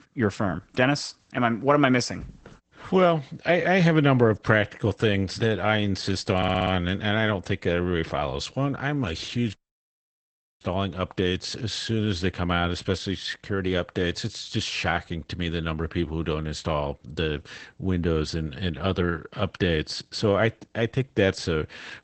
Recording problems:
garbled, watery; badly; nothing above 8 kHz
audio stuttering; at 6.5 s
audio cutting out; at 9.5 s for 1 s

